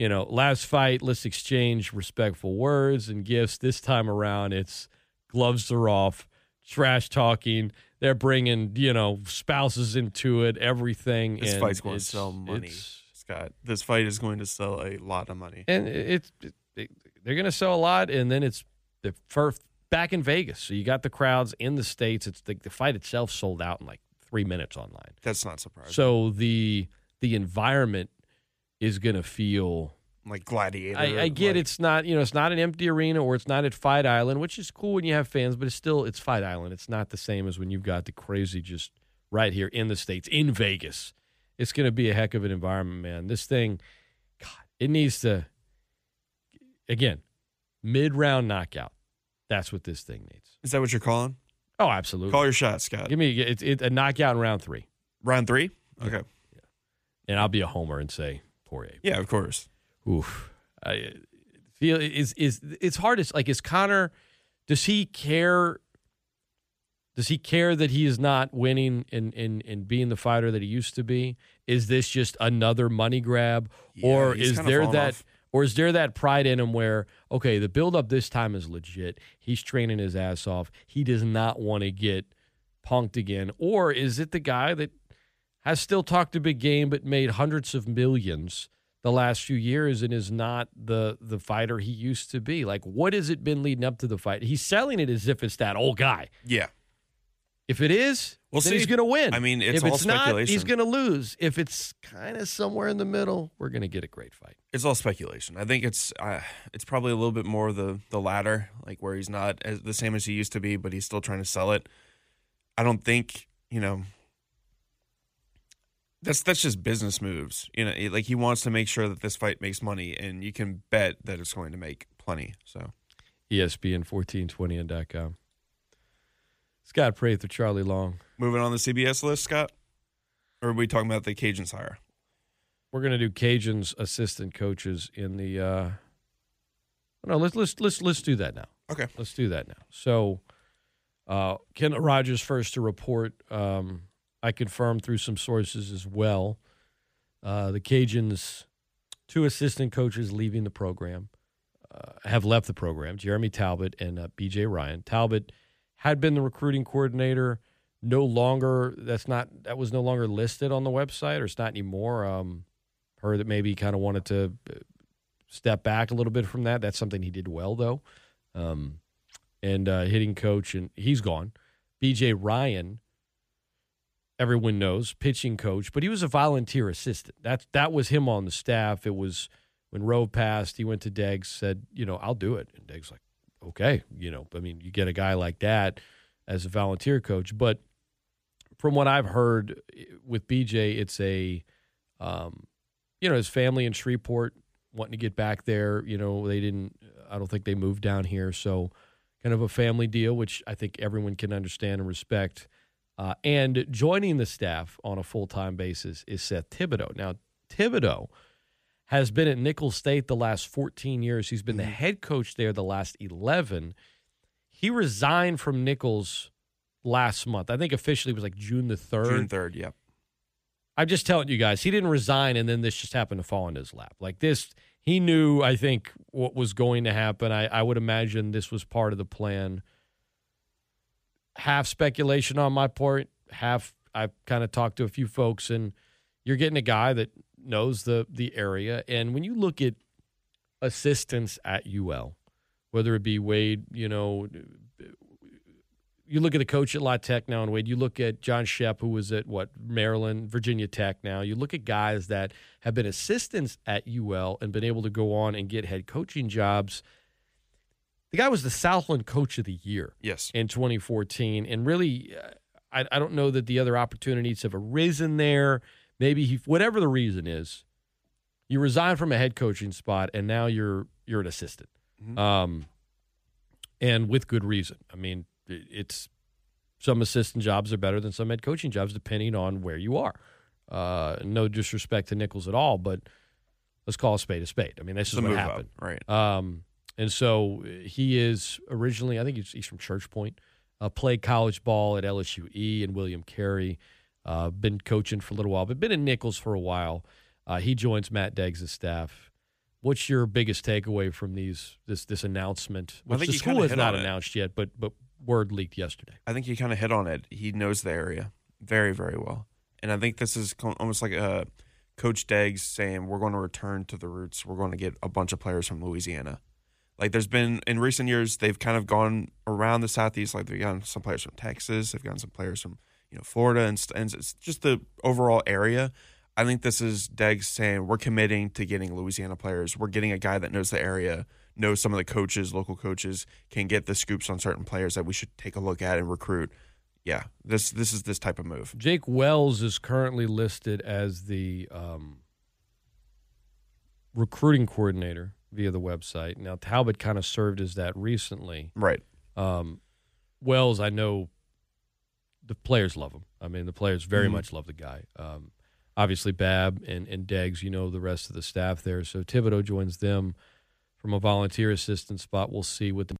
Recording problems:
abrupt cut into speech; at the start

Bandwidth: 15 kHz